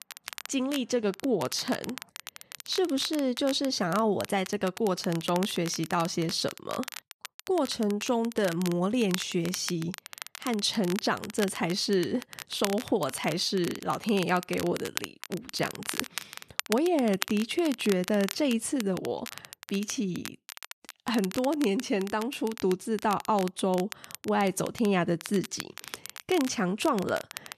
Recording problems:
crackle, like an old record; noticeable; 10 dB below the speech

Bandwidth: 14 kHz